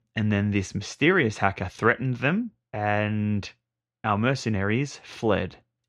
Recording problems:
muffled; slightly; fading above 3 kHz

